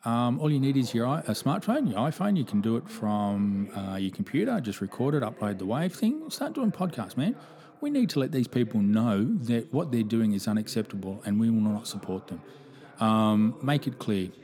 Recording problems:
voice in the background; faint; throughout; 20 dB below the speech

